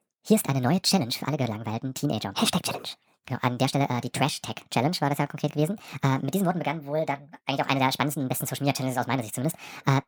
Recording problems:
wrong speed and pitch; too fast and too high; 1.5 times normal speed

